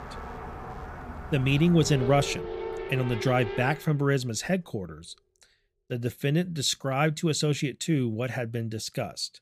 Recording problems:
traffic noise; loud; until 3.5 s; 10 dB below the speech

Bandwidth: 15 kHz